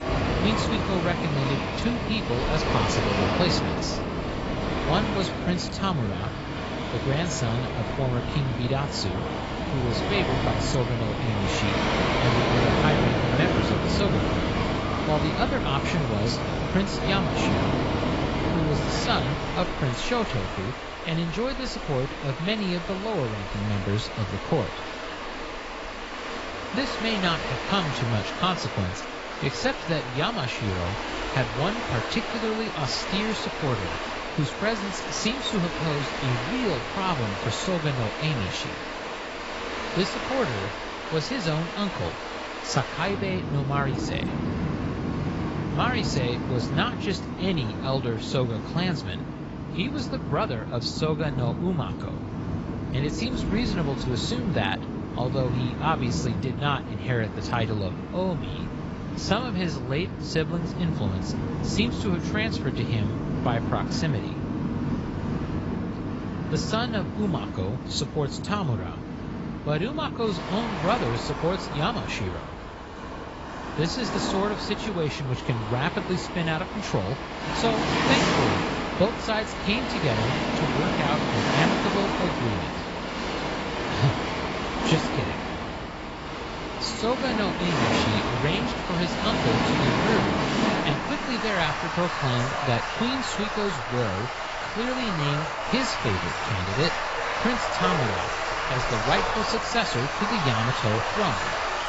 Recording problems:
garbled, watery; badly; nothing above 8 kHz
rain or running water; loud; throughout; as loud as the speech

